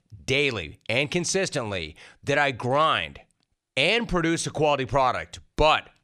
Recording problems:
none

